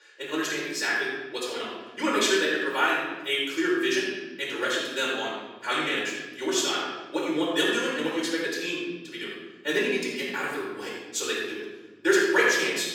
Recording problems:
room echo; strong; dies away in 1.4 s
off-mic speech; far
thin; very; fading below 350 Hz
wrong speed, natural pitch; too fast; 1.5 times normal speed

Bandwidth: 17.5 kHz